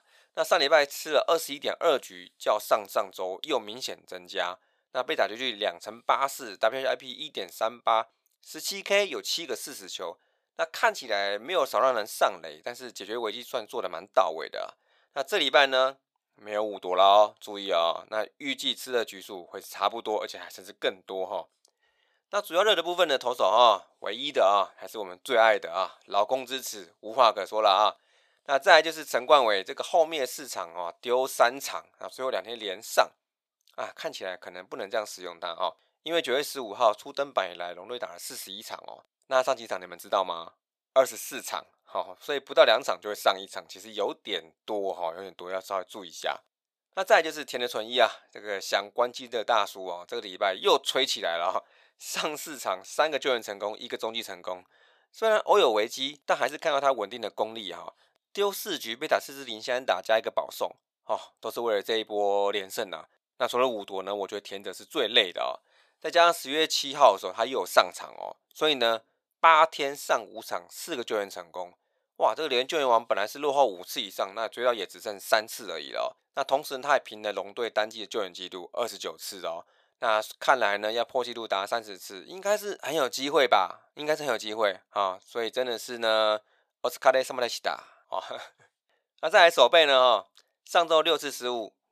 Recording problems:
thin; very; fading below 600 Hz

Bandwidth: 14.5 kHz